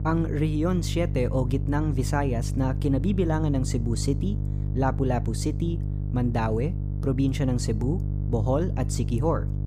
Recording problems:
electrical hum; noticeable; throughout; 50 Hz, 10 dB below the speech

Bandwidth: 15 kHz